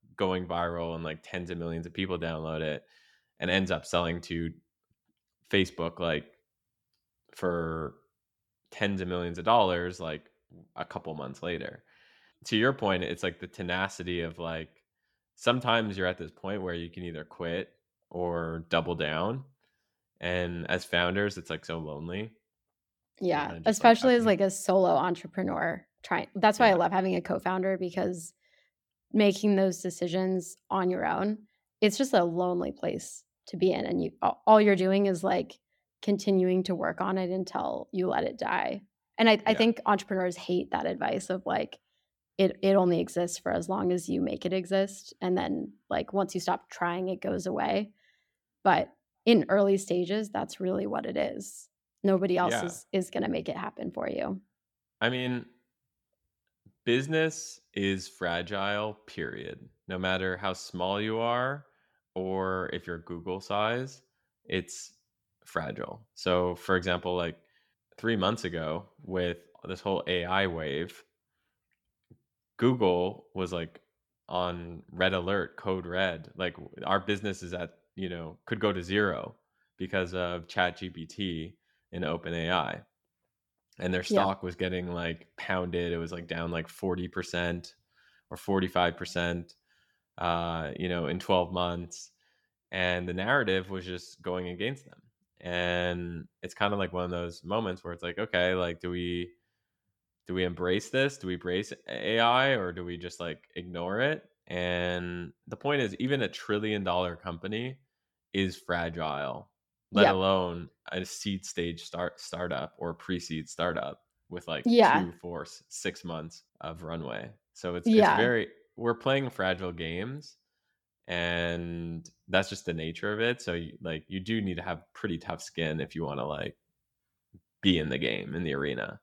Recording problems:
none

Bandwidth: 18.5 kHz